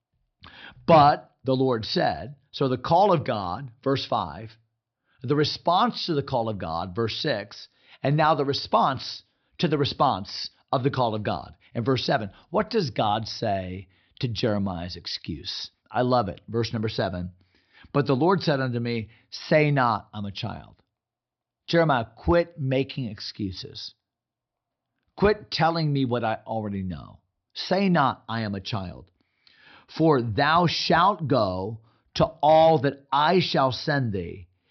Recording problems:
high frequencies cut off; noticeable; nothing above 5.5 kHz

